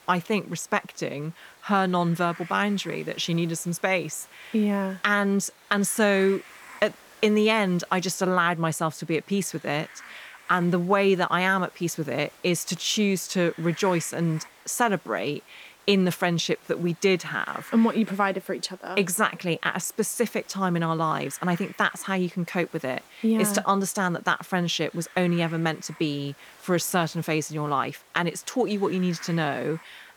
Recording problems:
hiss; faint; throughout; 25 dB below the speech

